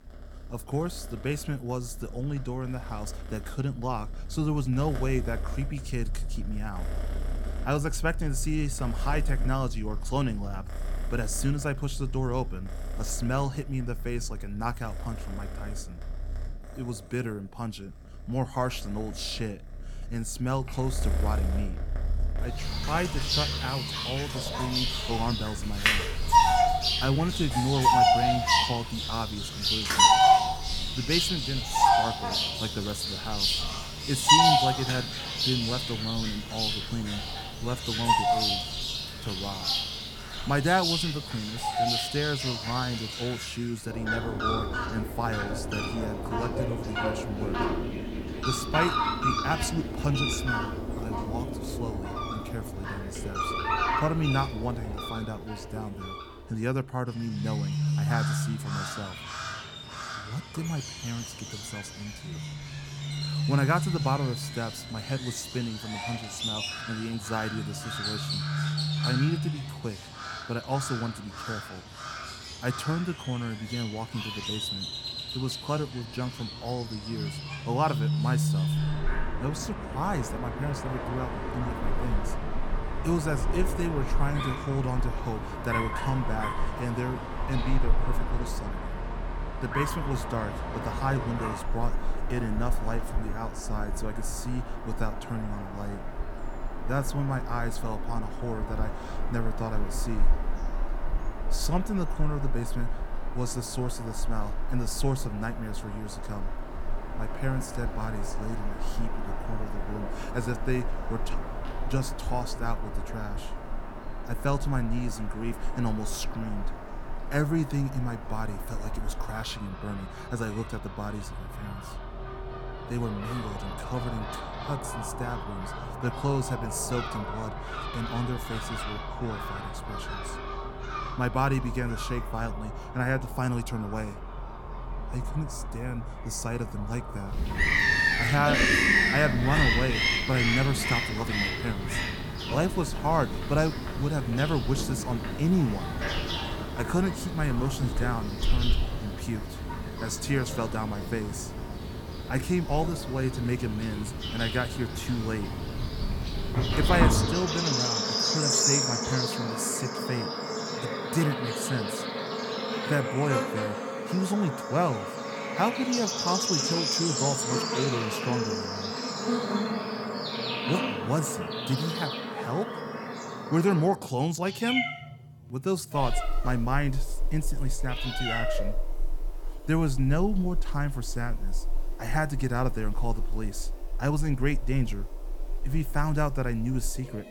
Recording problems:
animal sounds; very loud; throughout; 1 dB above the speech

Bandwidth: 17.5 kHz